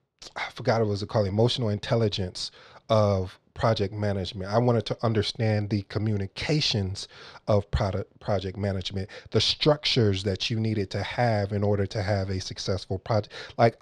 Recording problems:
muffled; very slightly; fading above 3 kHz

